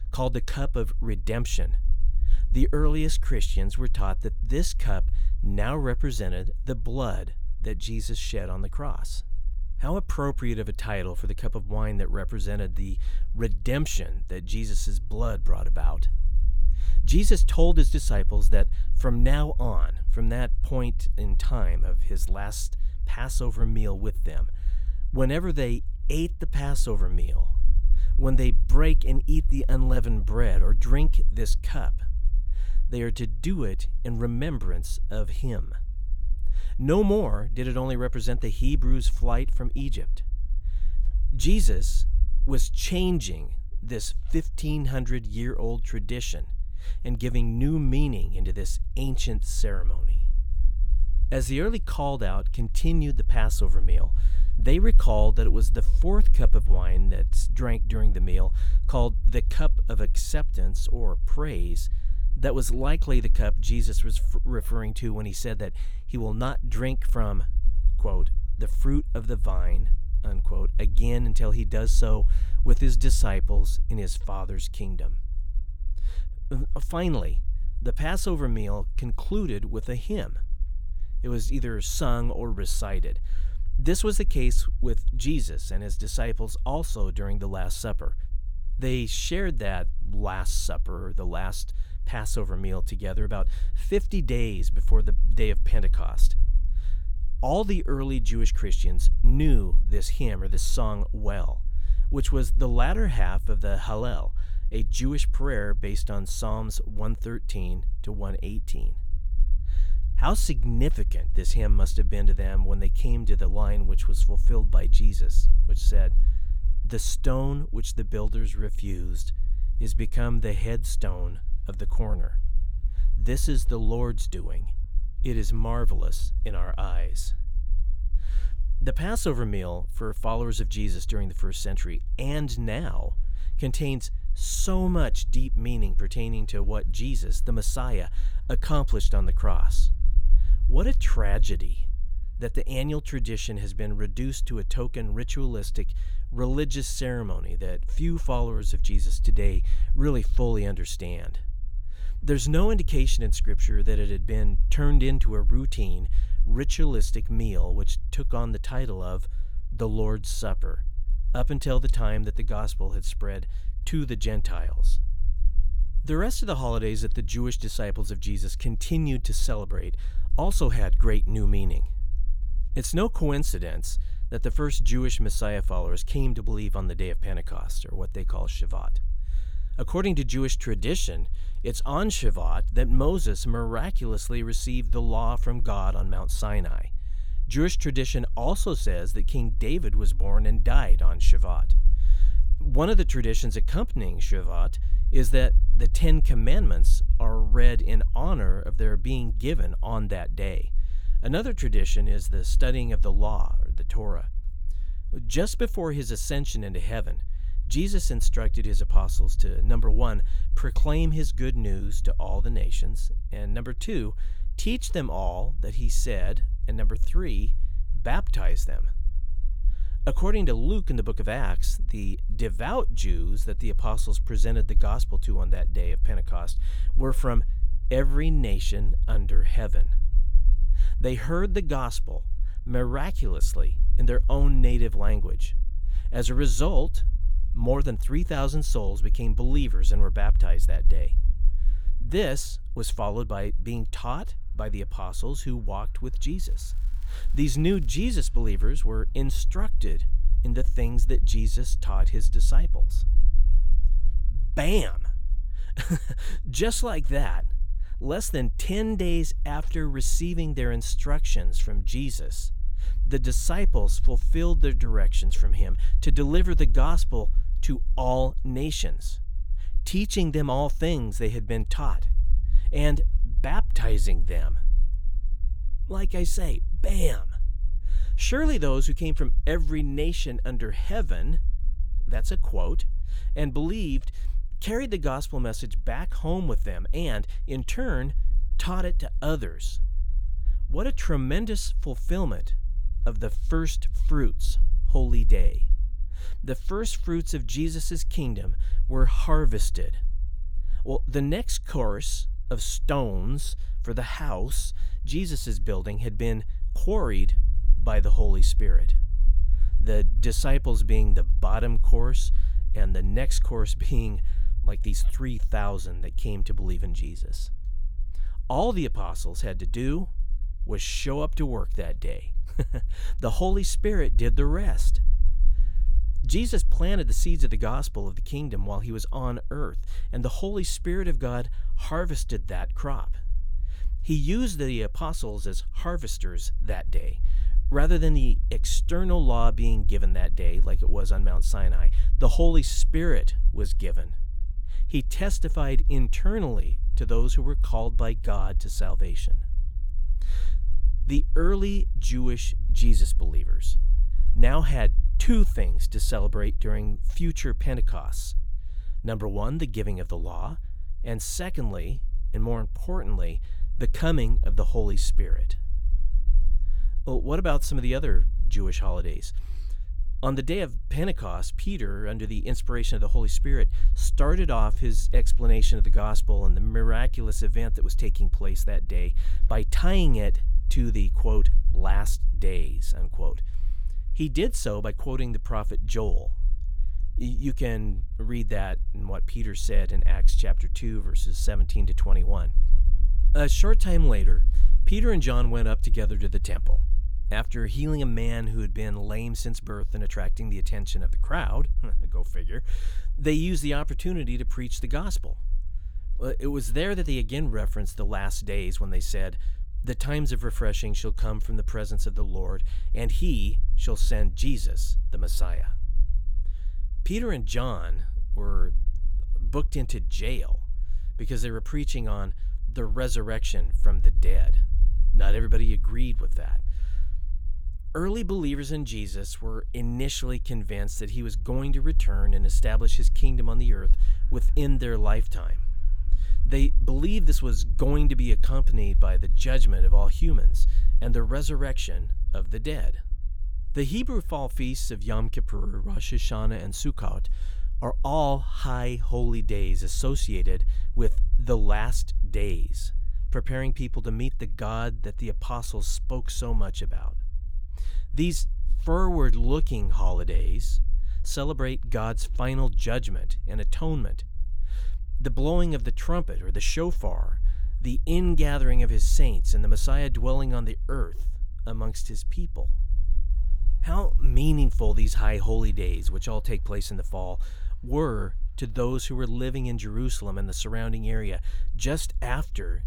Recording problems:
low rumble; faint; throughout; 20 dB below the speech
crackling; faint; from 4:06 to 4:08; 30 dB below the speech

